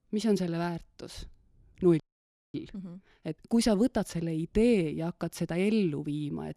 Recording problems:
audio freezing; at 2 s for 0.5 s

